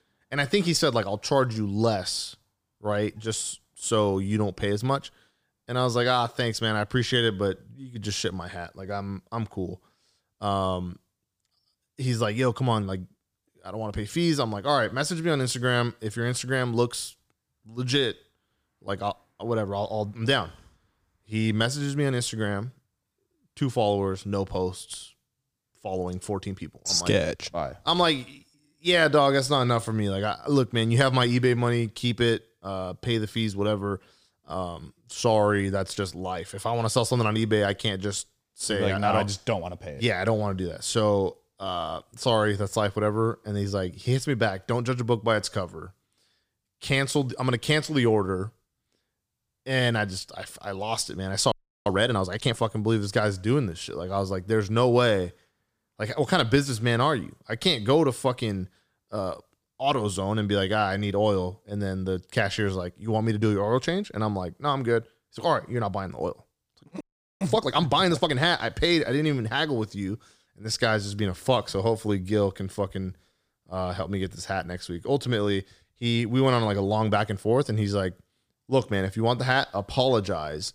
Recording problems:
audio freezing; at 52 s and at 1:07

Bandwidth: 15 kHz